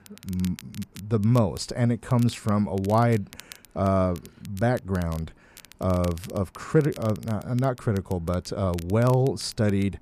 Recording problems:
crackle, like an old record; faint; 20 dB below the speech

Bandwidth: 14.5 kHz